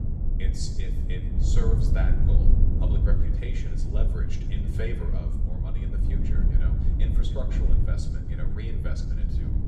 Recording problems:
room echo; very slight; dies away in 0.7 s
off-mic speech; somewhat distant
low rumble; loud; throughout; 1 dB below the speech

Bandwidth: 15 kHz